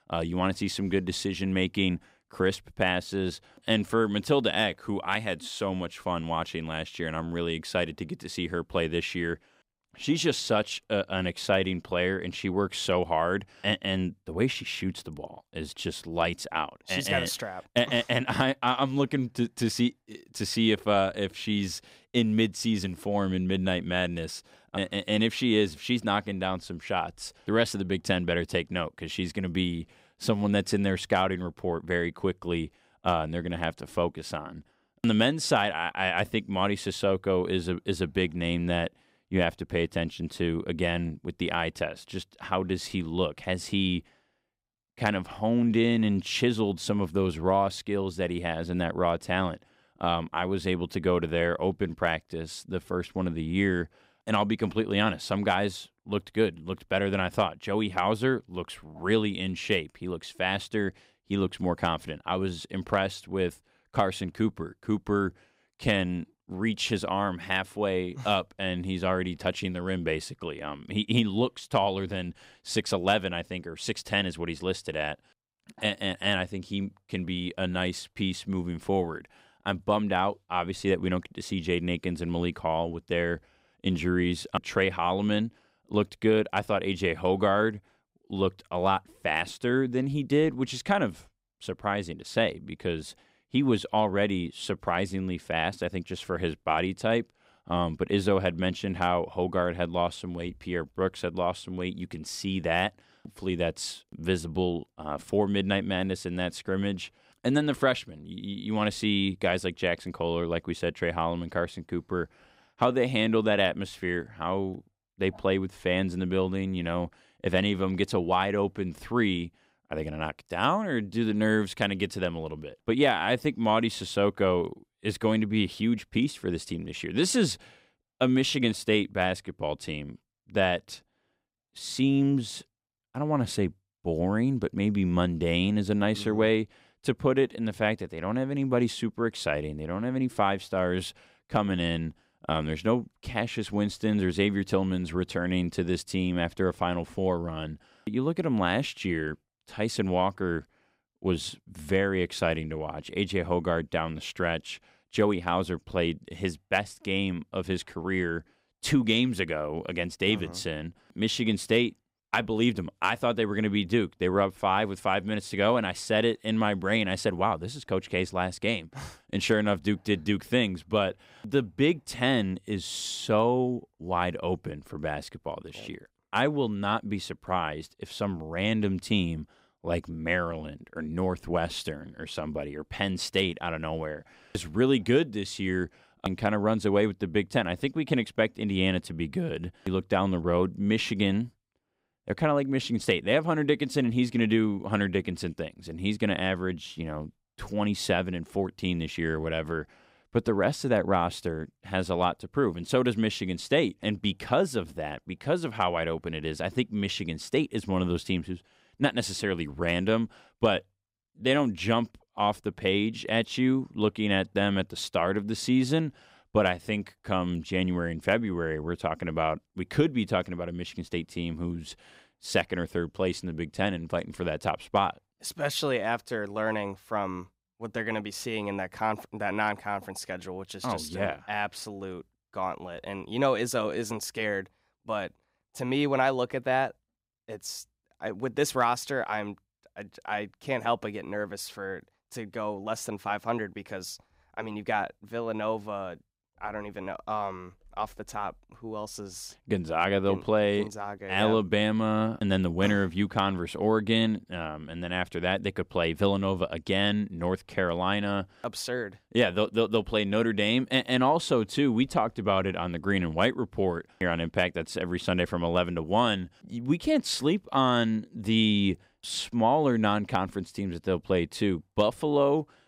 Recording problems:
none

